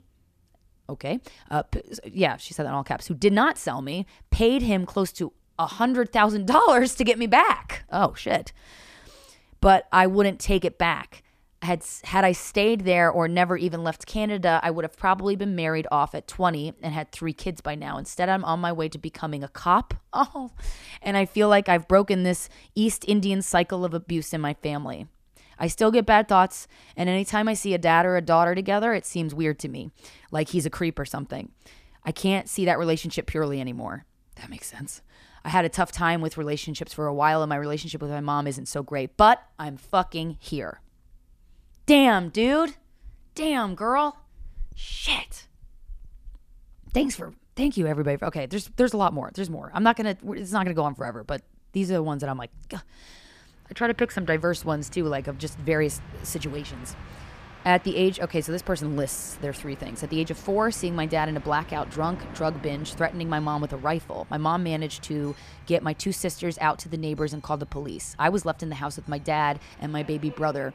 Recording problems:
train or aircraft noise; faint; from 54 s on; 20 dB below the speech

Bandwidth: 14.5 kHz